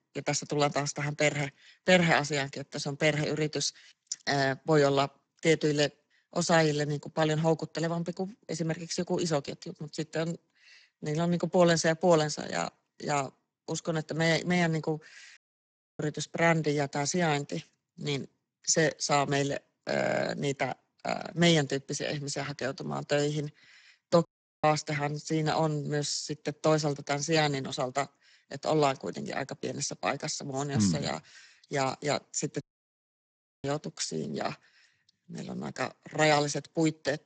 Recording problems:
garbled, watery; badly; nothing above 7.5 kHz
audio cutting out; at 15 s for 0.5 s, at 24 s and at 33 s for 1 s
audio stuttering; at 20 s

